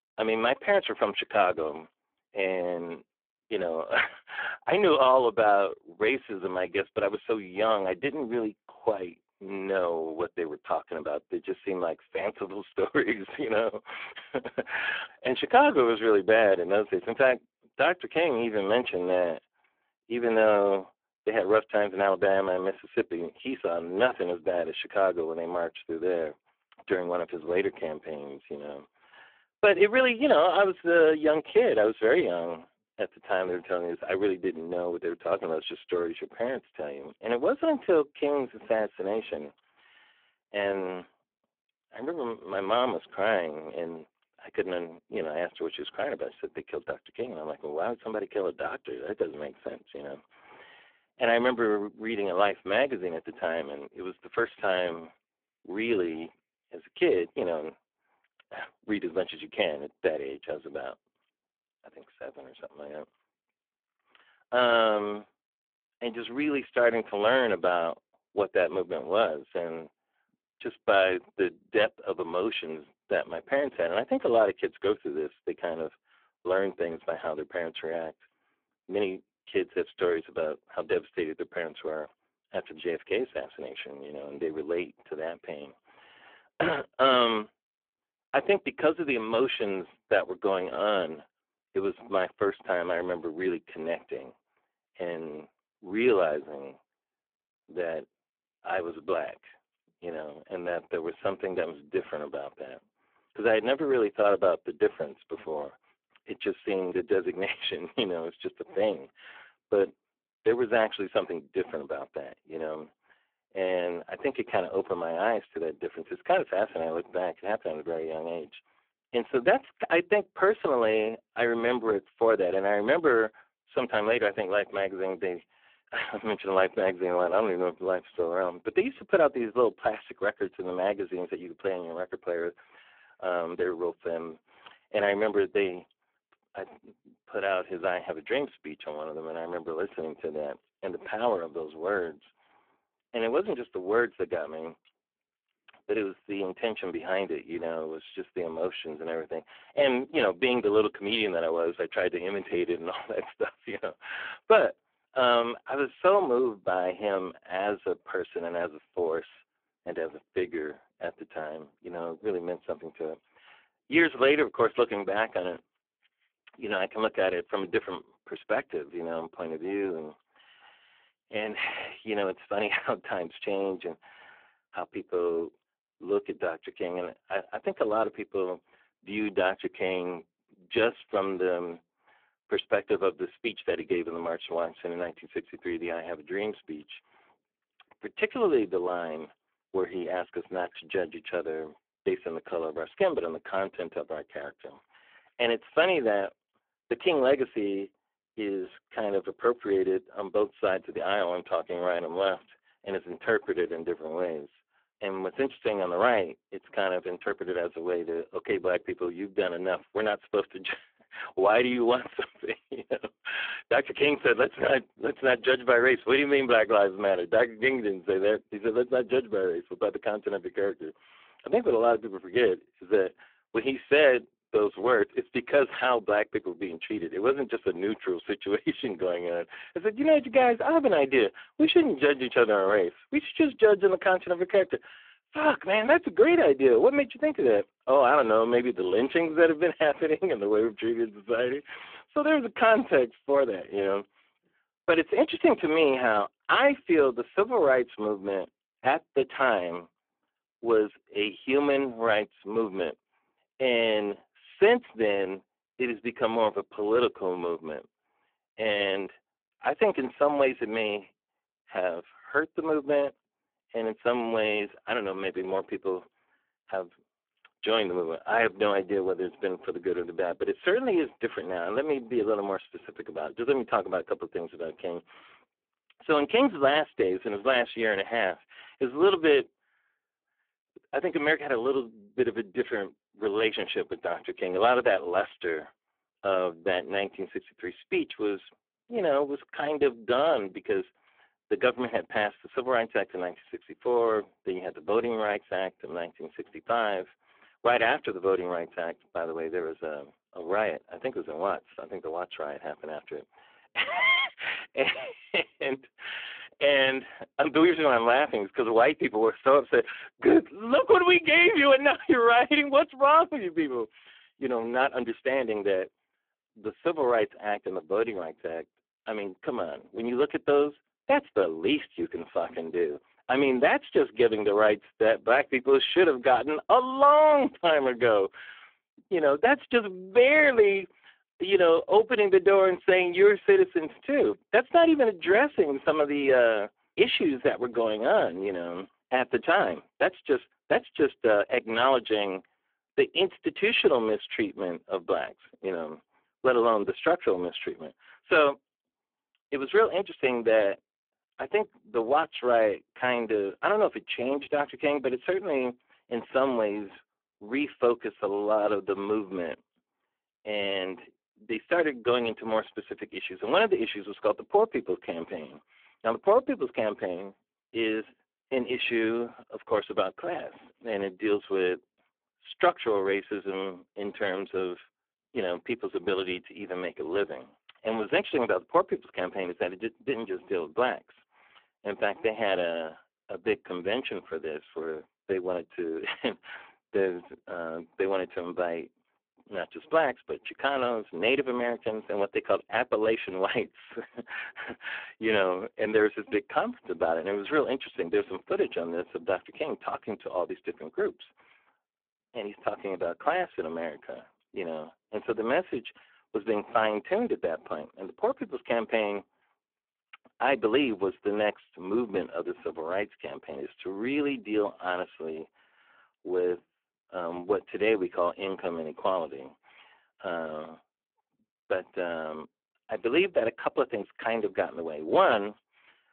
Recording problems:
phone-call audio; poor line; nothing above 3.5 kHz

